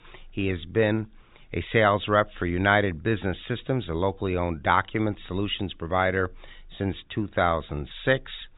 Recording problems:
high frequencies cut off; severe; nothing above 4 kHz

